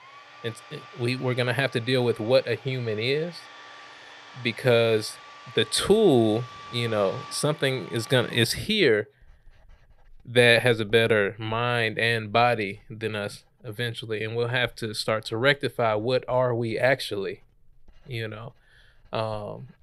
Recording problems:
household noises; faint; throughout; 20 dB below the speech

